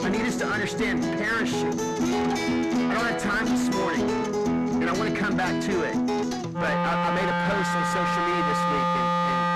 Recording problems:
distortion; heavy; 6 dB below the speech
background music; very loud; throughout; 2 dB above the speech

